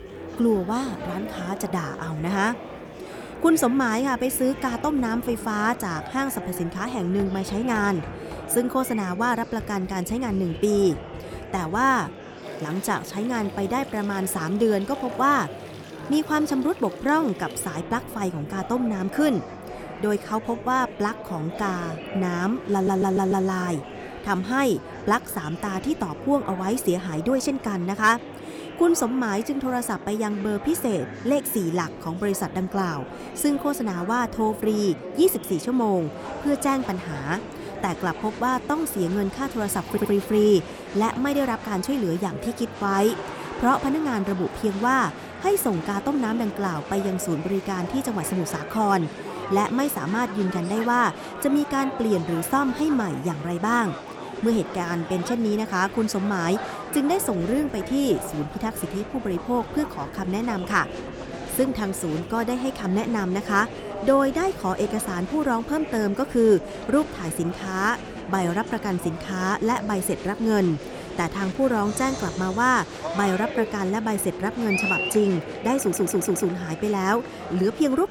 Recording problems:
murmuring crowd; noticeable; throughout; 10 dB below the speech
household noises; faint; until 35 s; 25 dB below the speech
audio stuttering; at 23 s, at 40 s and at 1:16

